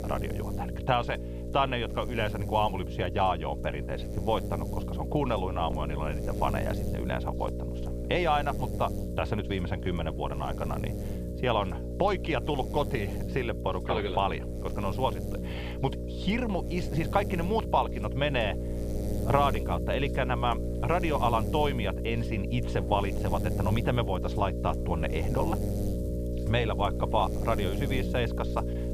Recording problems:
muffled; slightly; fading above 4 kHz
electrical hum; loud; throughout; 60 Hz, 10 dB below the speech

